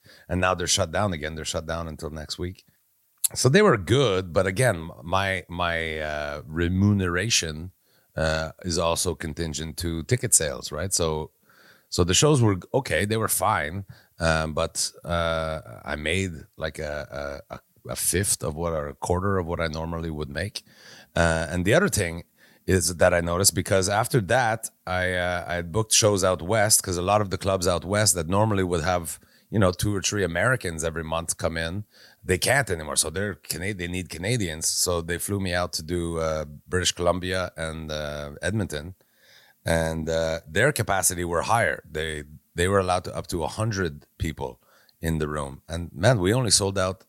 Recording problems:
none

